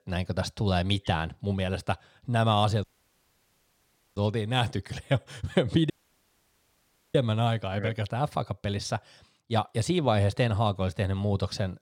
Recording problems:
audio cutting out; at 3 s for 1.5 s and at 6 s for 1 s

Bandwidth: 16.5 kHz